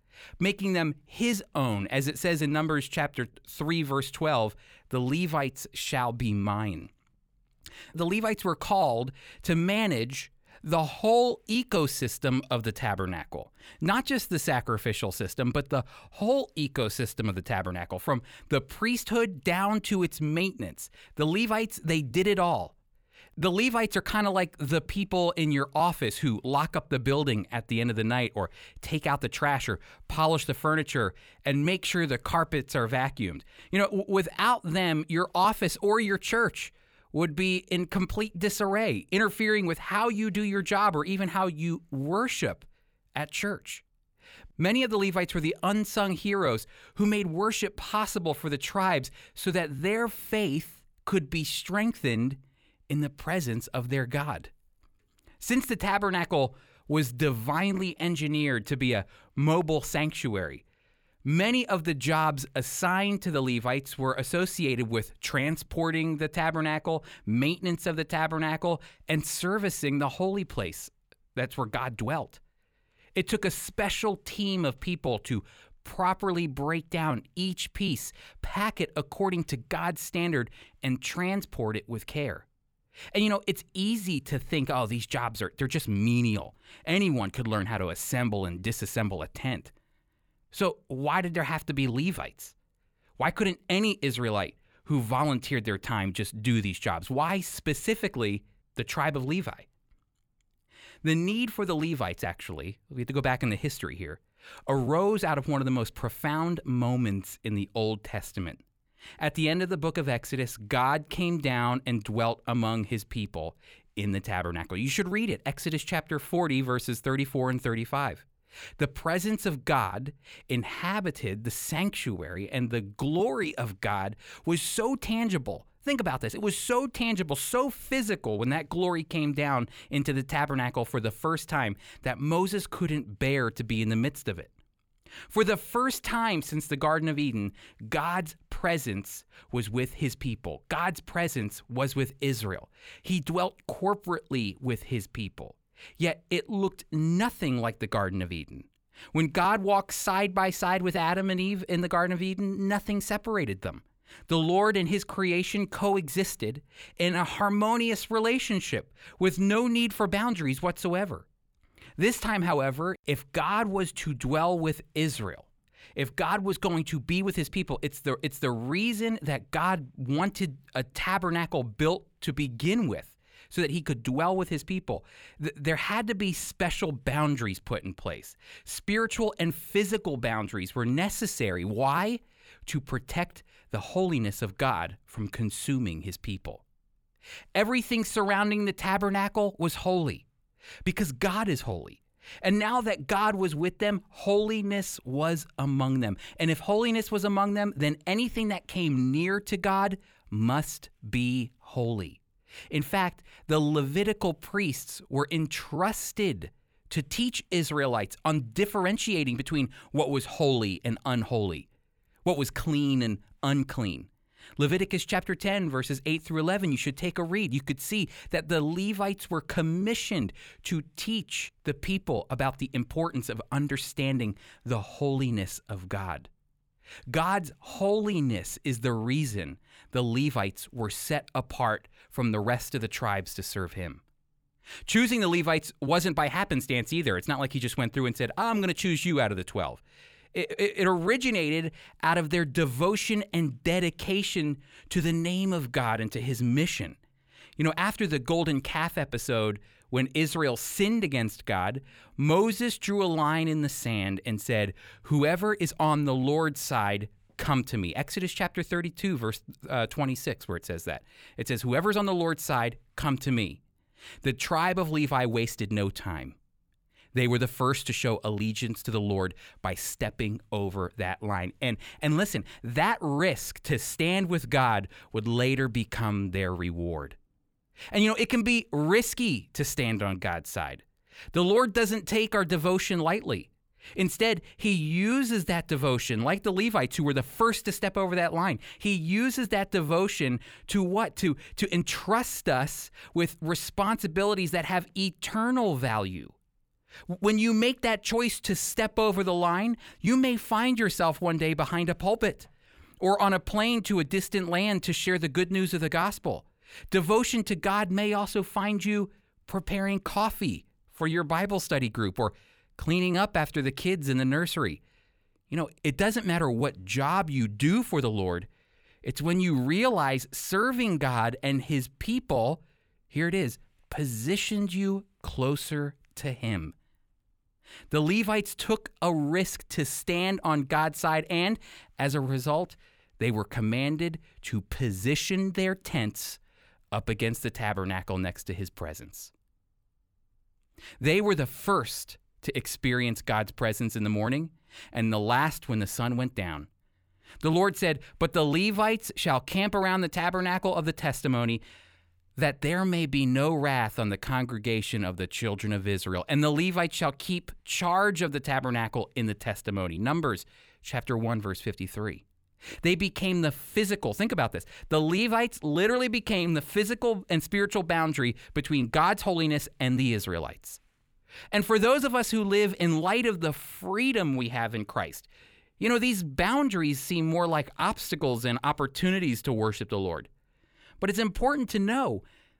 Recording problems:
none

